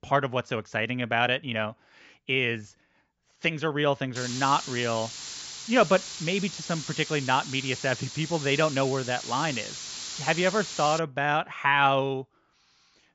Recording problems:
high frequencies cut off; noticeable; nothing above 8 kHz
hiss; loud; from 4 to 11 s; 9 dB below the speech

